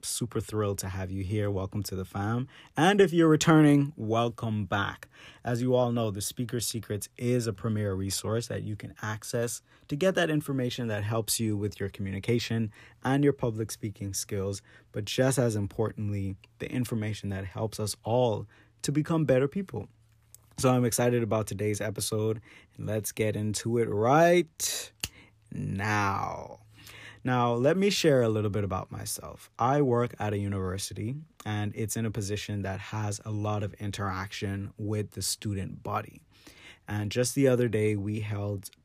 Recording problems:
none

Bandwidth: 14.5 kHz